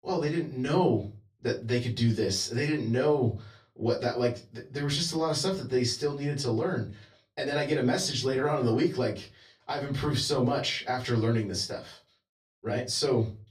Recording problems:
off-mic speech; far
room echo; very slight; dies away in 0.3 s

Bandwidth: 14.5 kHz